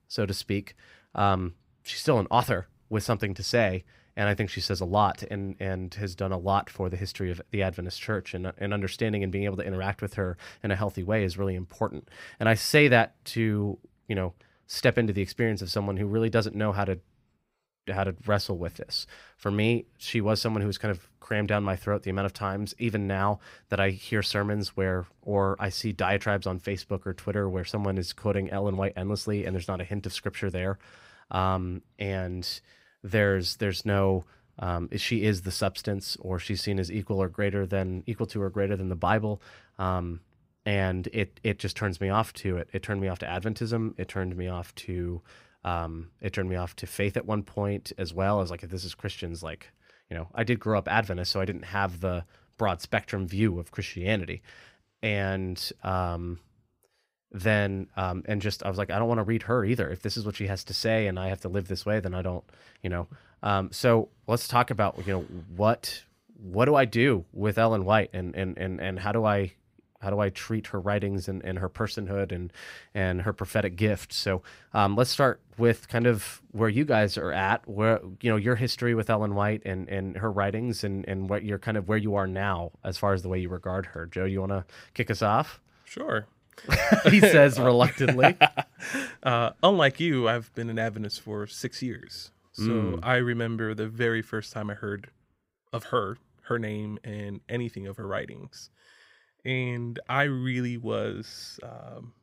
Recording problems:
none

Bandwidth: 15.5 kHz